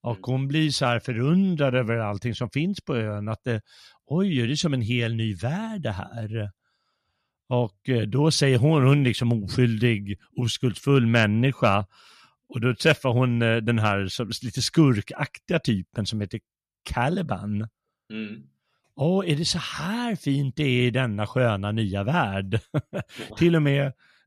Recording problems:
none

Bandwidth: 14.5 kHz